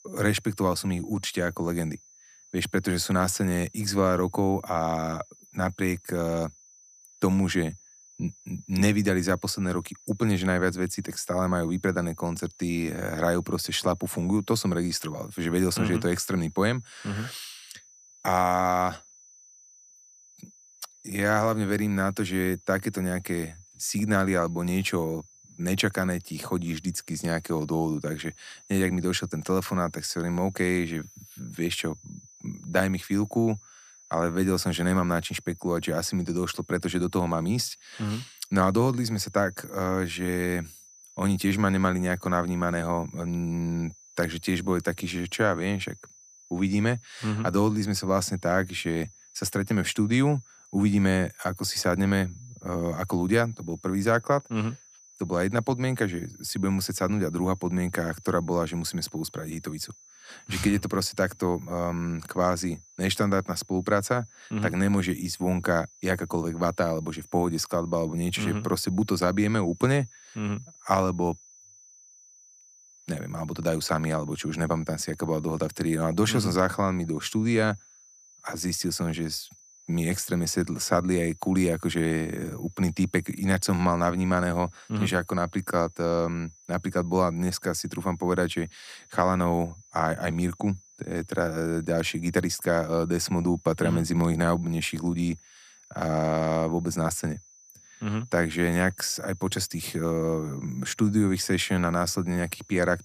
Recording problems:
high-pitched whine; faint; throughout; 6 kHz, 25 dB below the speech

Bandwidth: 14.5 kHz